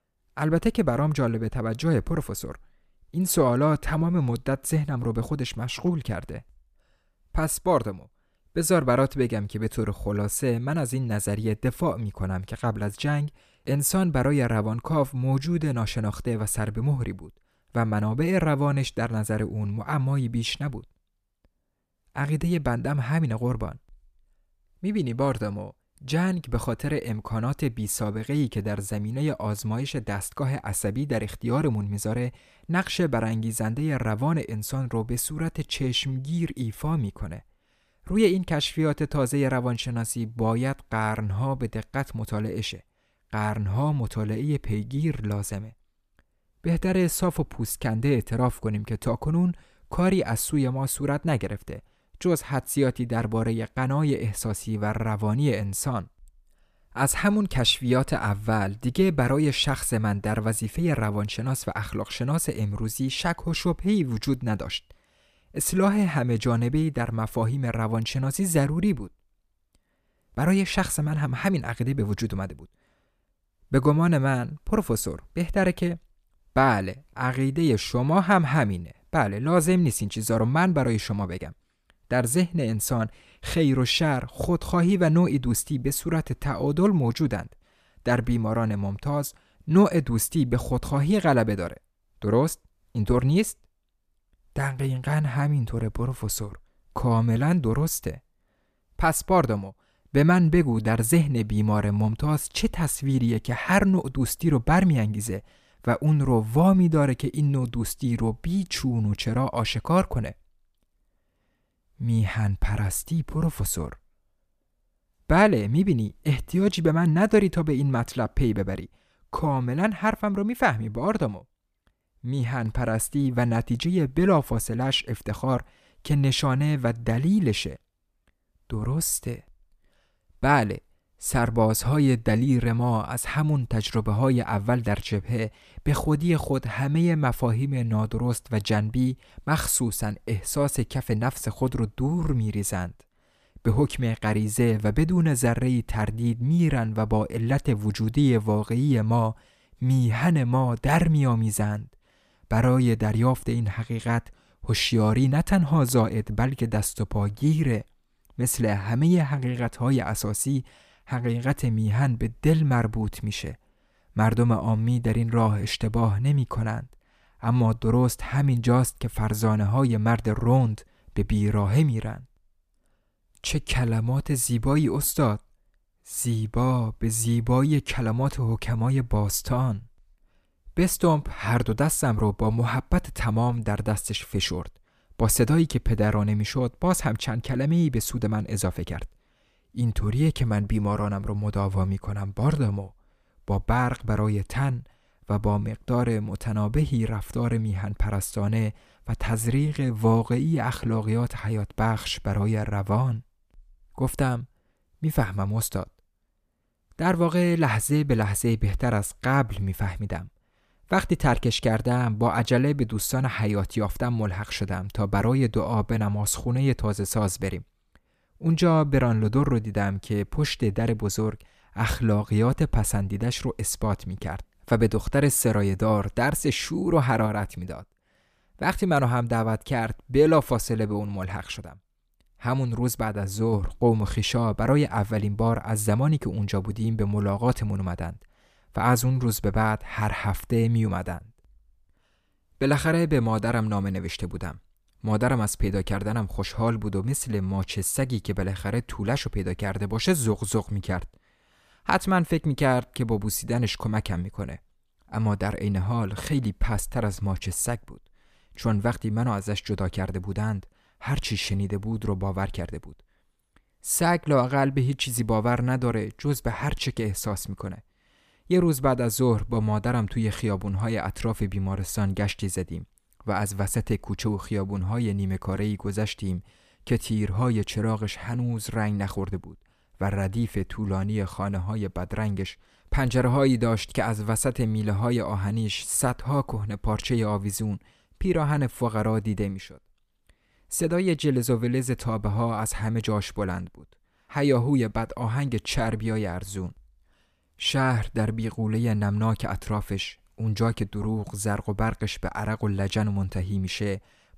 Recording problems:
none

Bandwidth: 14.5 kHz